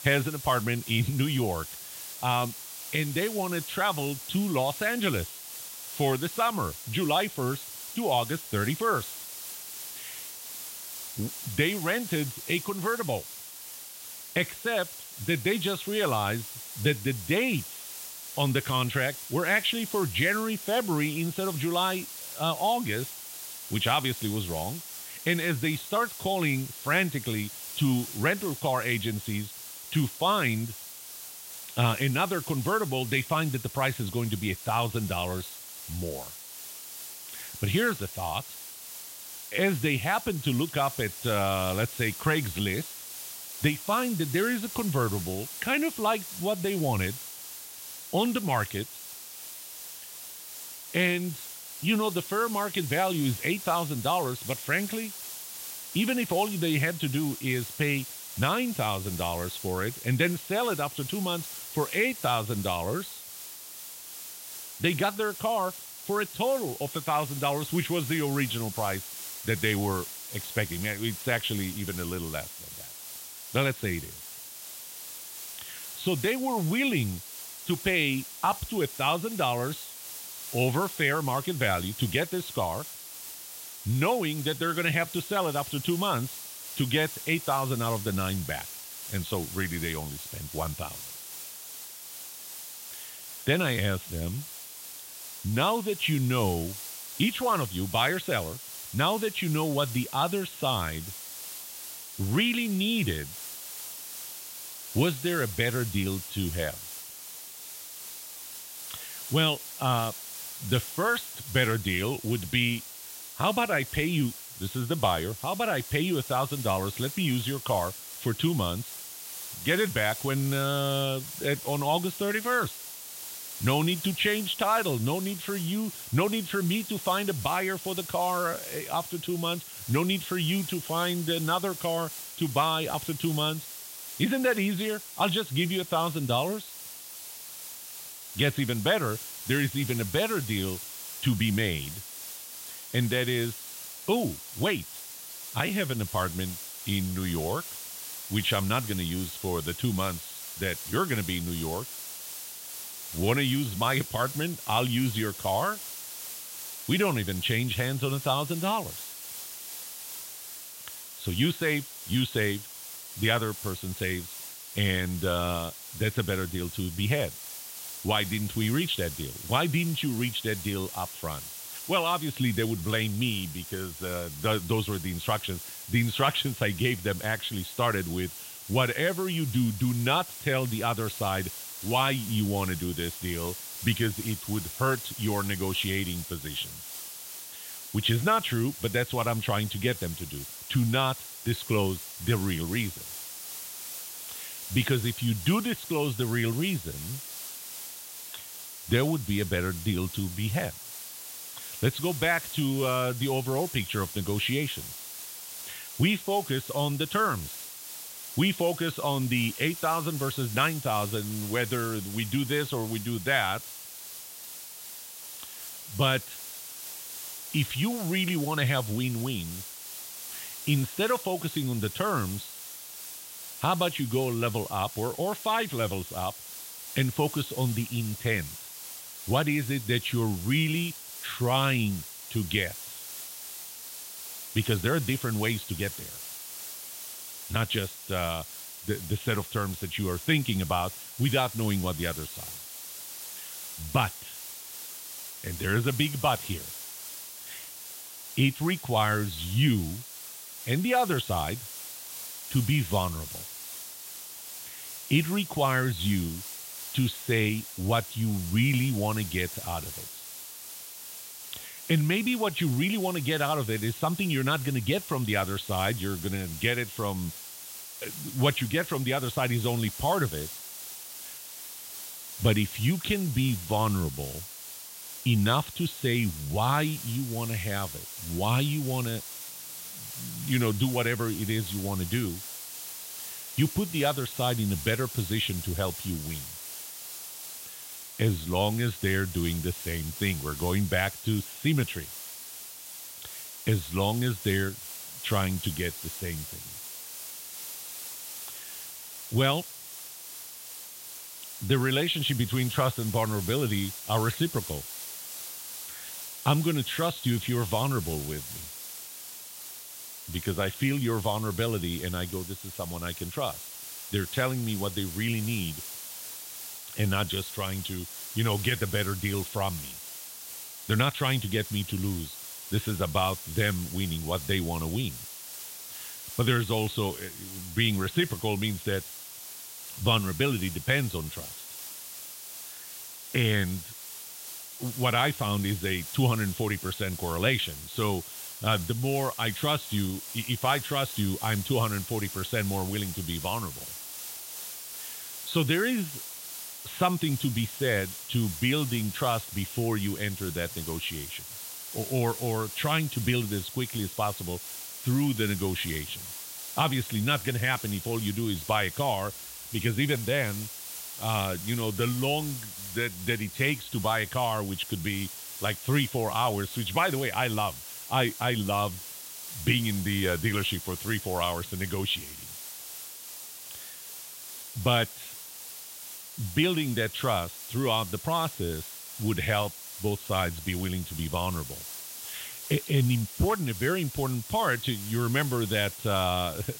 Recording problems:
high frequencies cut off; severe; nothing above 4 kHz
hiss; loud; throughout; 9 dB below the speech

